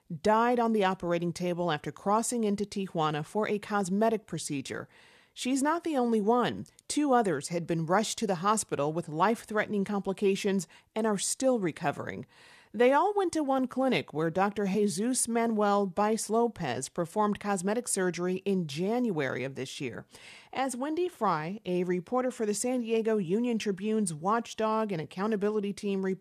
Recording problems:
none

